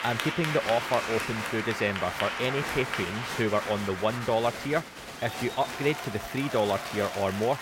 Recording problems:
crowd noise; loud; throughout; 4 dB below the speech

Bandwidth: 16 kHz